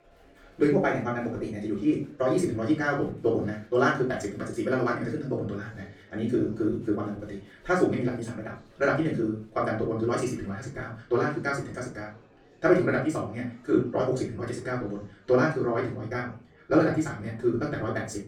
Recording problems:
off-mic speech; far
wrong speed, natural pitch; too fast; 1.7 times normal speed
room echo; slight; dies away in 0.3 s
murmuring crowd; faint; throughout; 30 dB below the speech

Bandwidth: 17.5 kHz